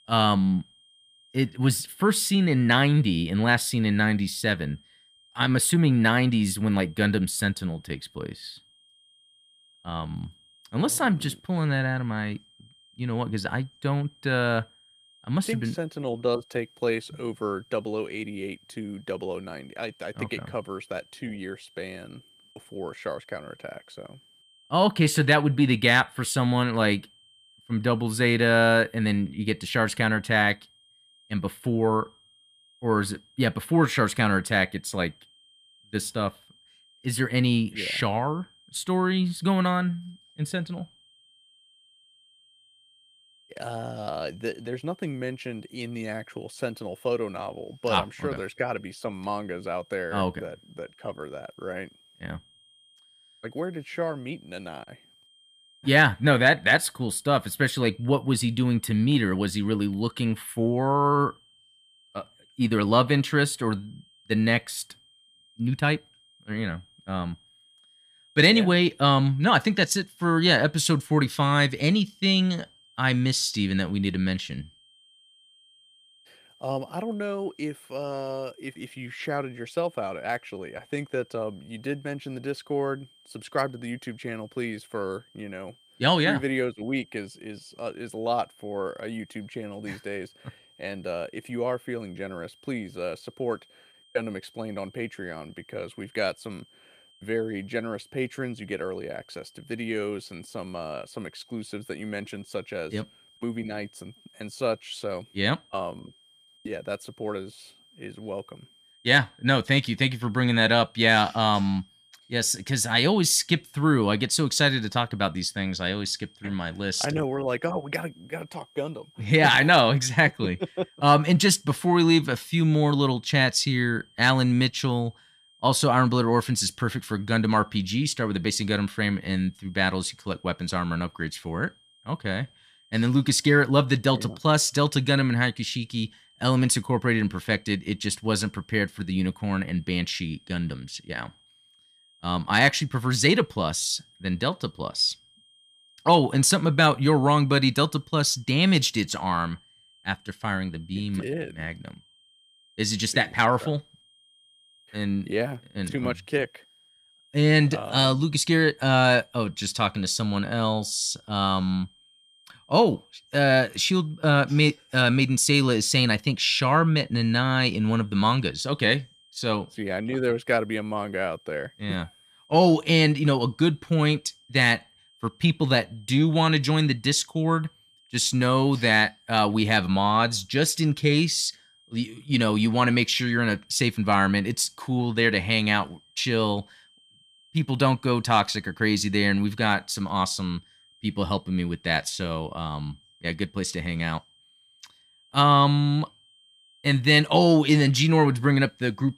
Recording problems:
high-pitched whine; faint; throughout; 3 kHz, 30 dB below the speech

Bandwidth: 15 kHz